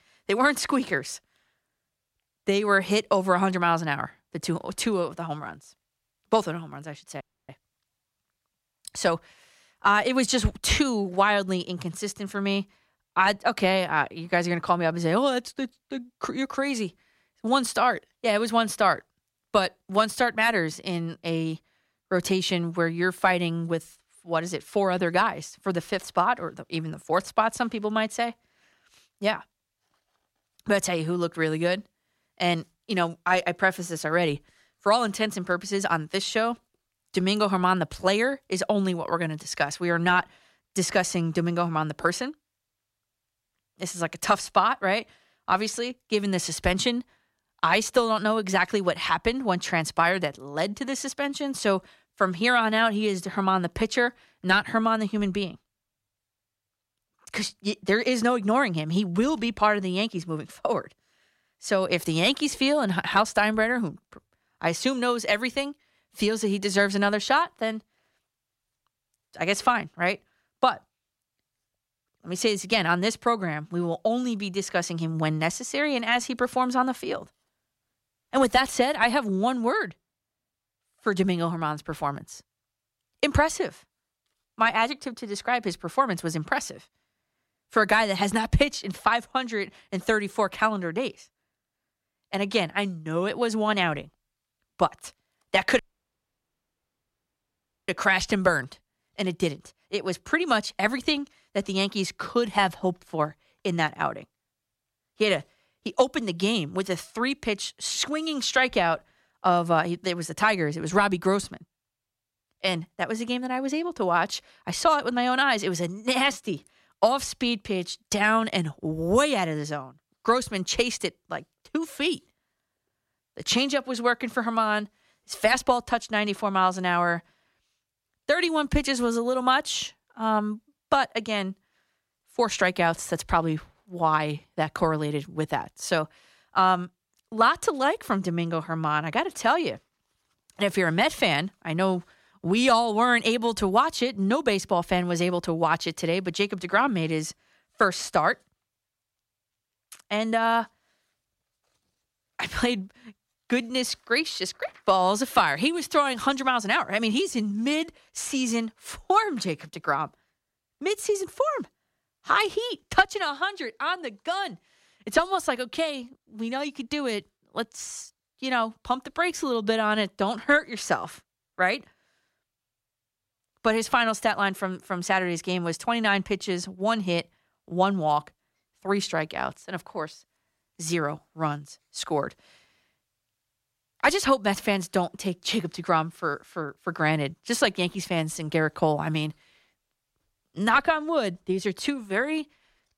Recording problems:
audio cutting out; at 7 s and at 1:36 for 2 s

